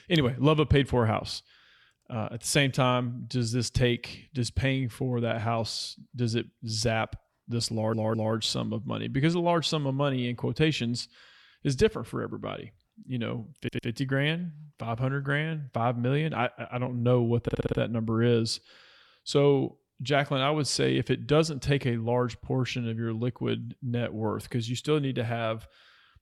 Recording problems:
audio stuttering; at 7.5 s, at 14 s and at 17 s

